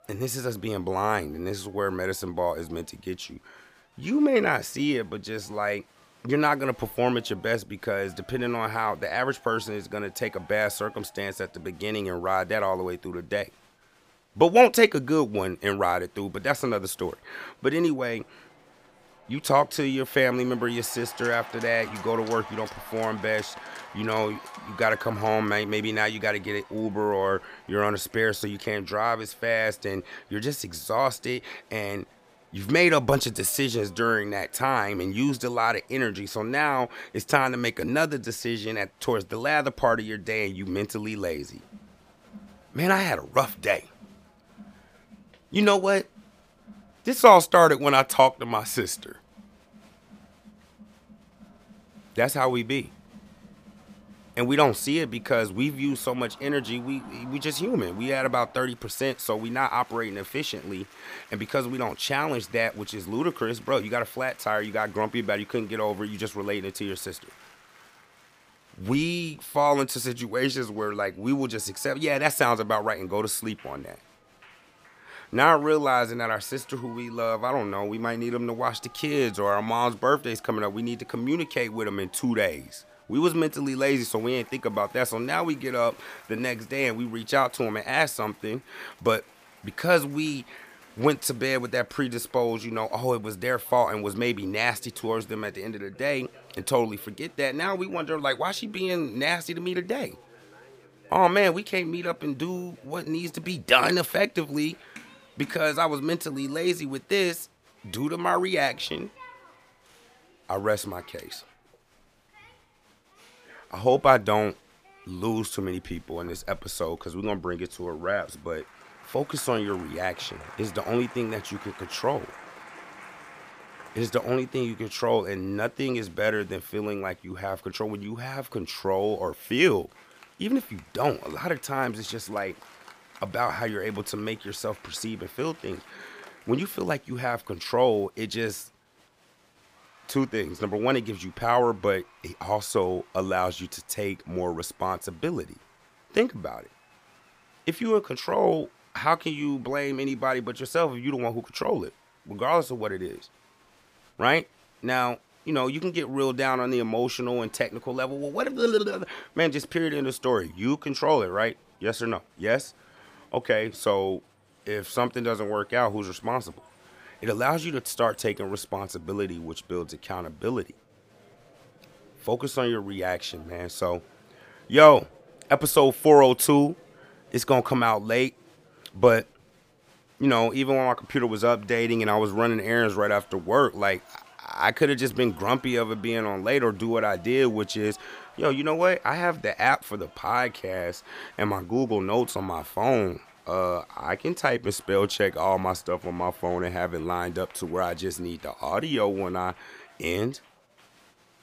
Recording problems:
crowd noise; faint; throughout; 25 dB below the speech

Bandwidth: 15 kHz